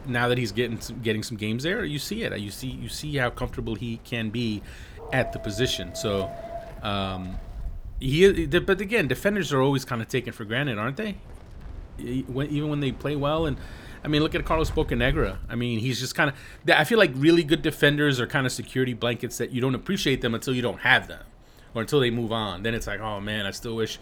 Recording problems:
wind in the background; noticeable; throughout; 20 dB below the speech
dog barking; faint; from 5 to 7.5 s; peak 10 dB below the speech

